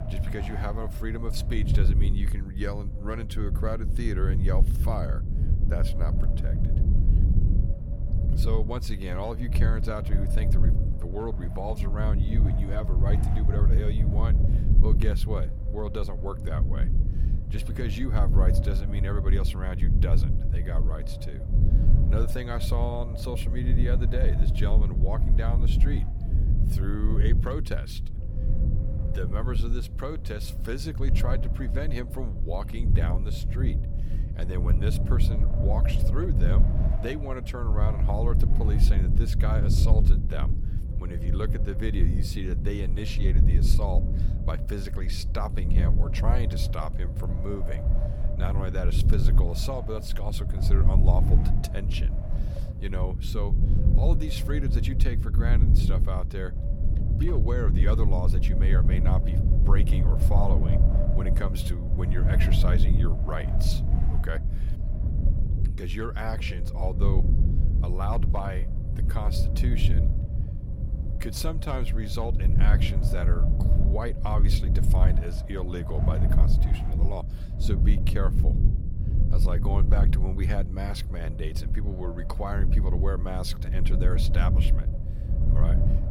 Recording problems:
low rumble; loud; throughout; 5 dB below the speech
wind noise on the microphone; occasional gusts; 10 dB below the speech

